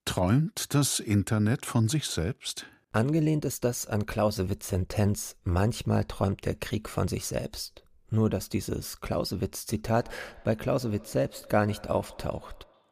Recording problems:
echo of what is said; faint; from 10 s on; 130 ms later, 25 dB below the speech

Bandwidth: 15 kHz